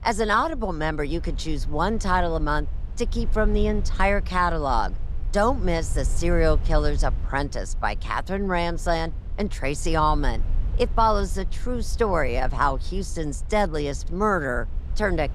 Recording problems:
low rumble; faint; throughout; 25 dB below the speech

